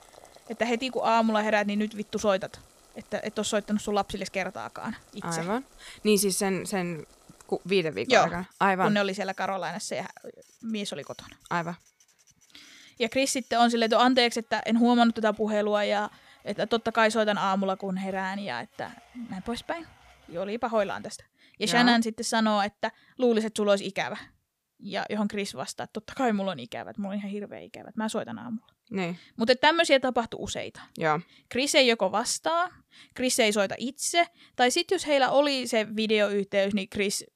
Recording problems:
household noises; faint; until 21 s; 30 dB below the speech

